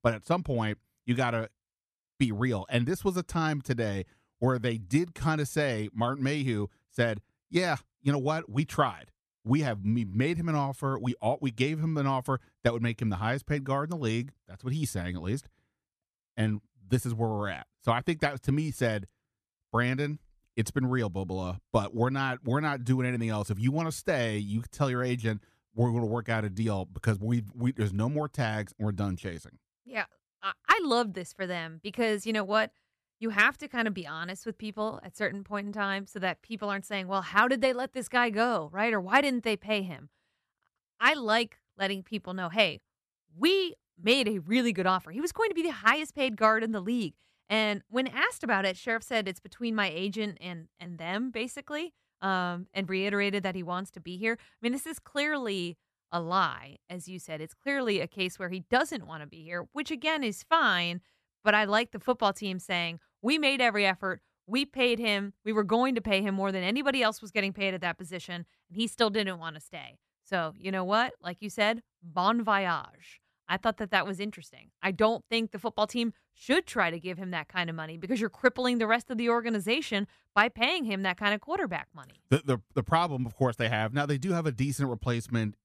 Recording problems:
none

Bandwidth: 14.5 kHz